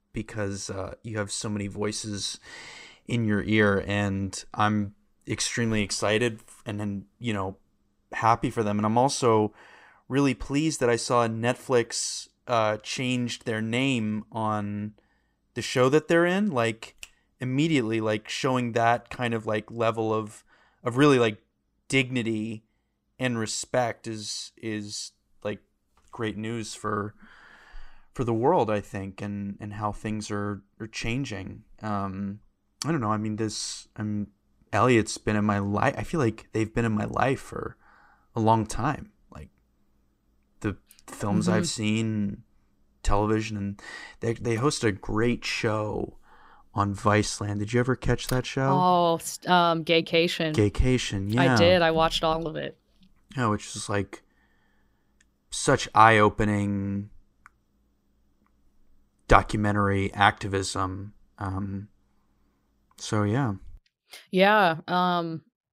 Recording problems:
none

